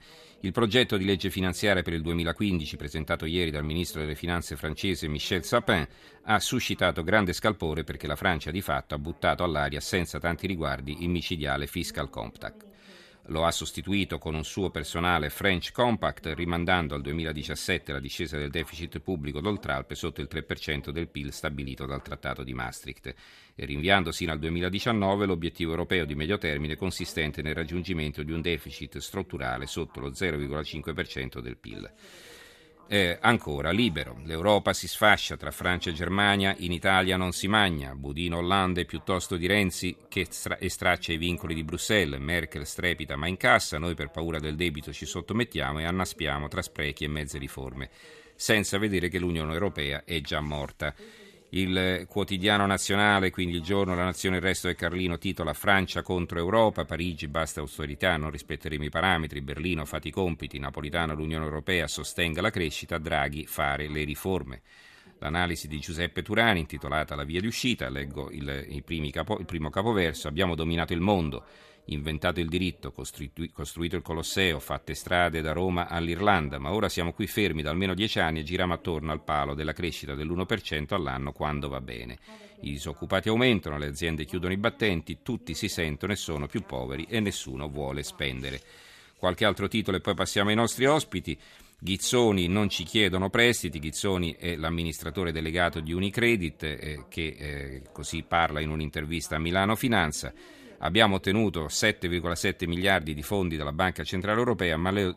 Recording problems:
voice in the background; faint; throughout; 30 dB below the speech

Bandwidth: 14 kHz